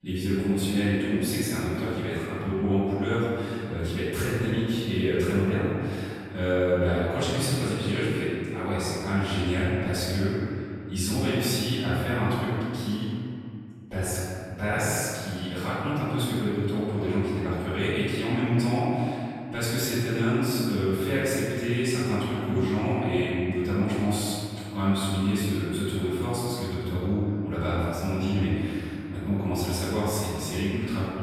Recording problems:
room echo; strong; dies away in 2.3 s
off-mic speech; far

